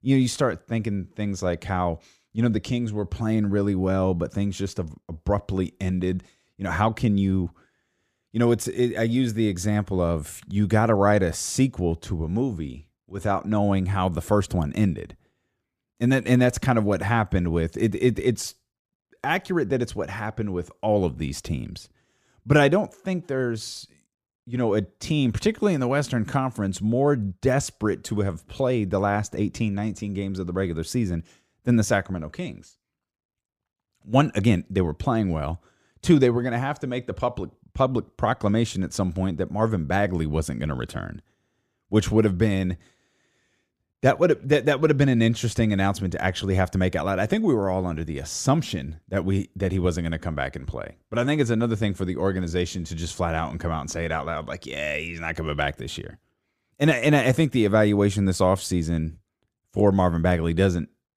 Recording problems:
none

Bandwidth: 15 kHz